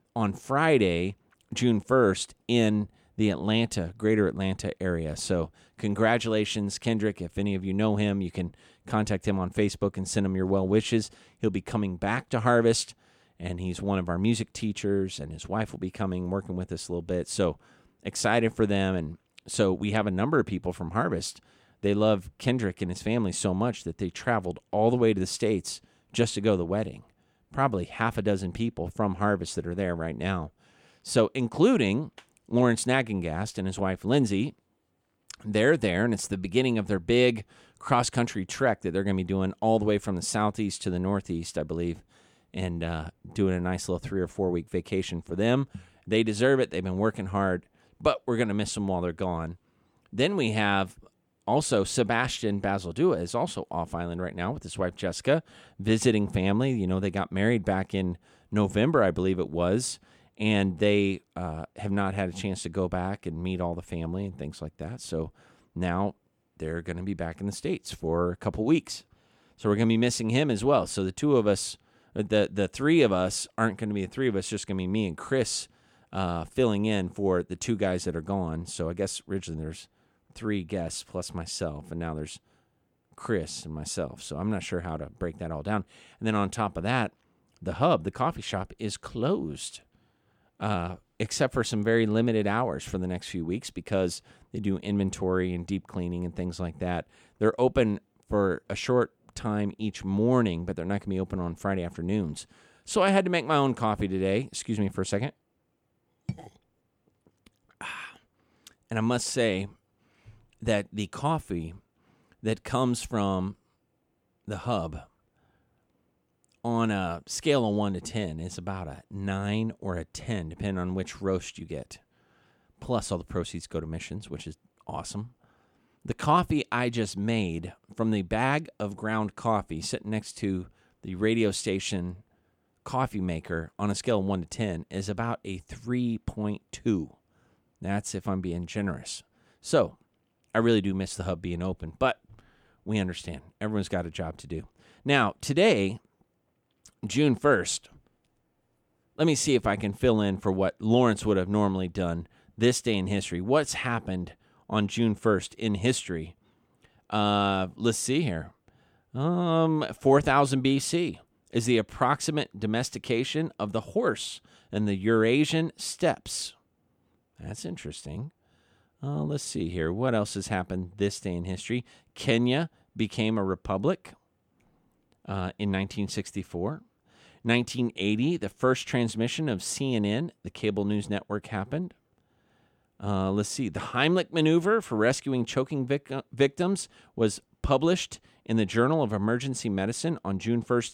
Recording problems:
none

